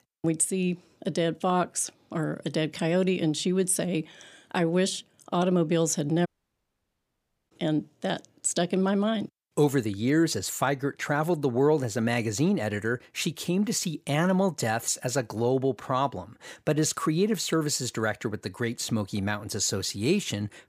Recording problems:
audio cutting out; at 6.5 s for 1.5 s

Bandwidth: 15 kHz